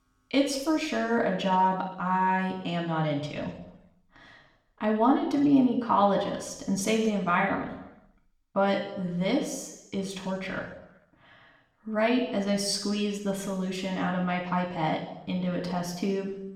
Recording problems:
room echo; noticeable; dies away in 0.8 s
off-mic speech; somewhat distant

